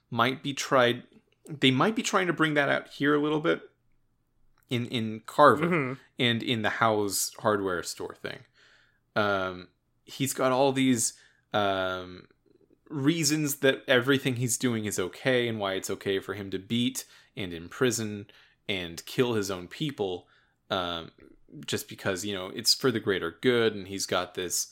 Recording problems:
none

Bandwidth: 16 kHz